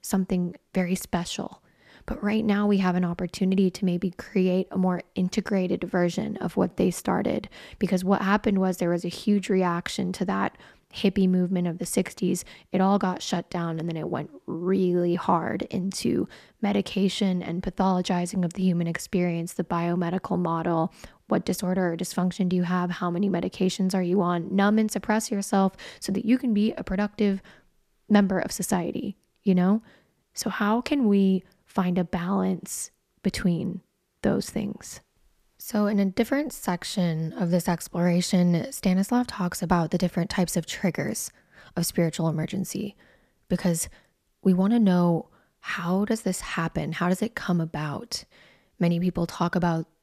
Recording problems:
none

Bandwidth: 14.5 kHz